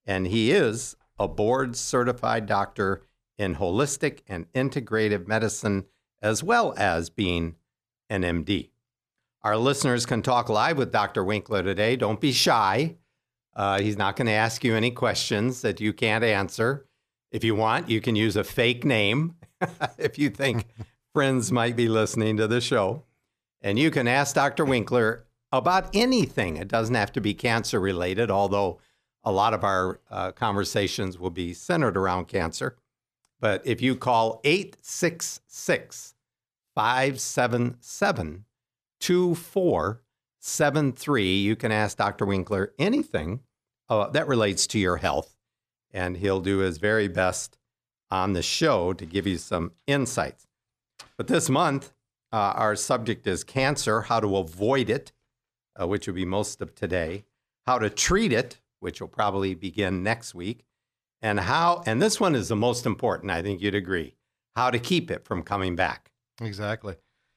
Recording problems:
none

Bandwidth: 14.5 kHz